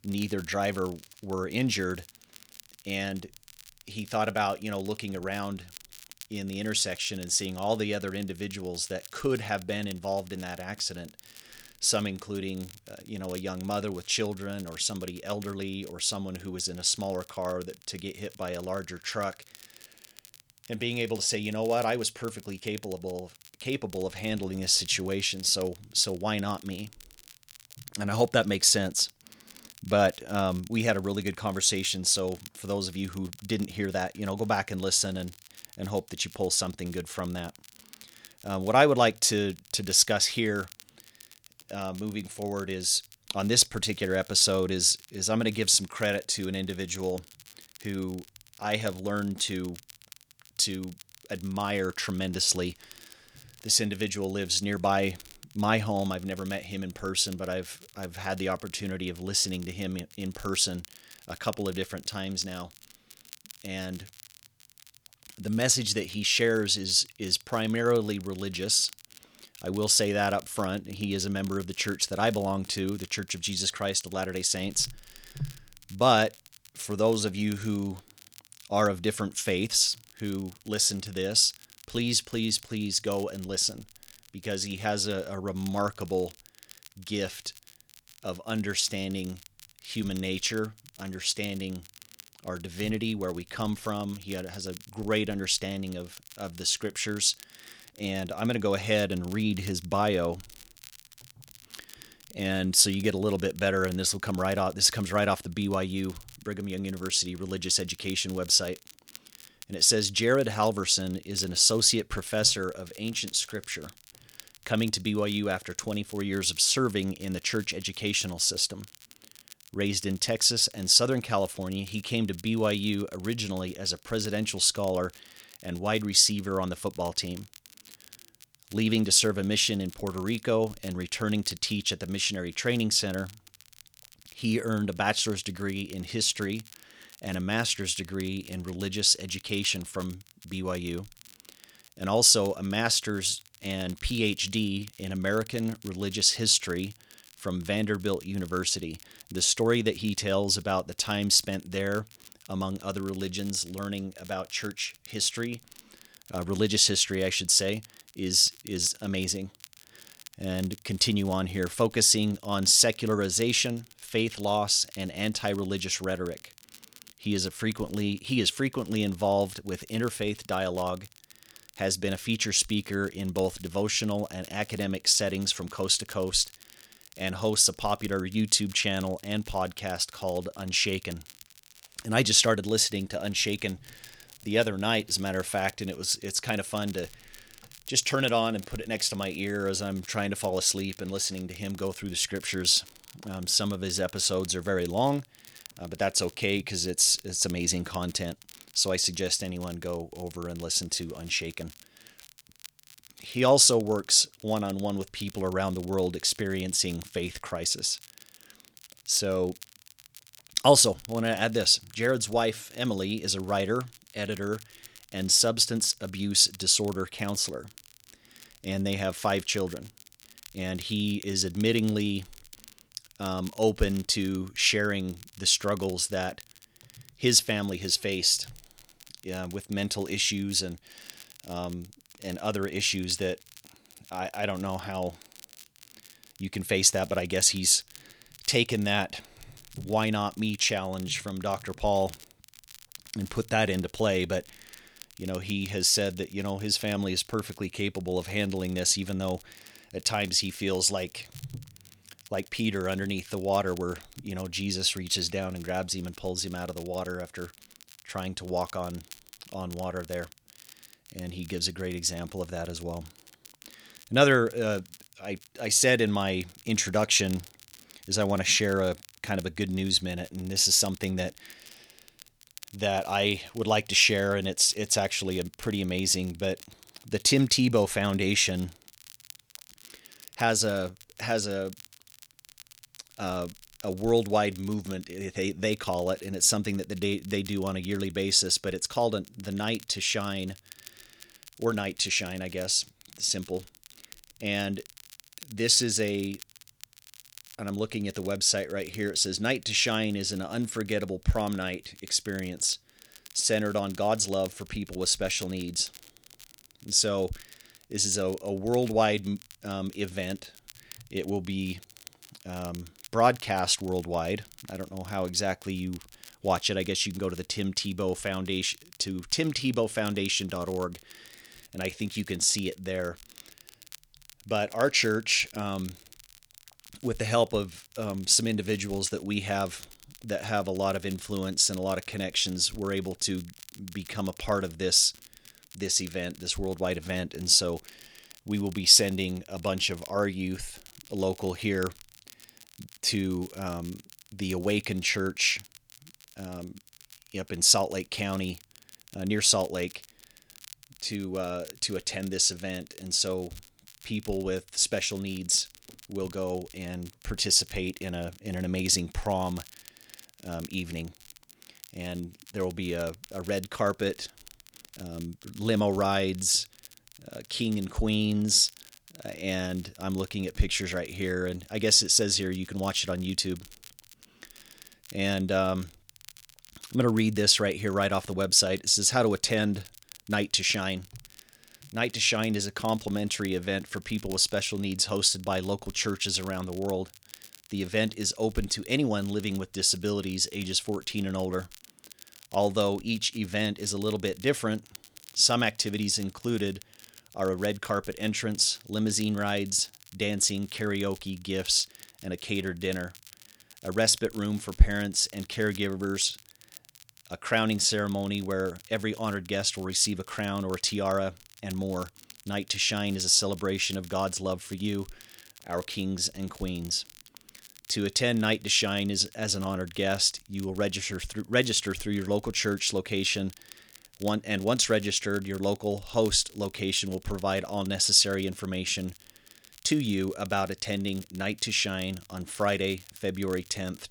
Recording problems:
crackle, like an old record; faint; 25 dB below the speech

